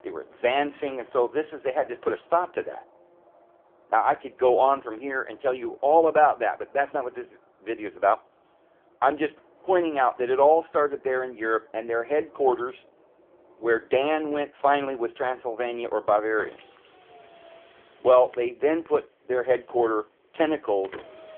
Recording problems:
phone-call audio; poor line; nothing above 3.5 kHz
traffic noise; faint; throughout; 30 dB below the speech

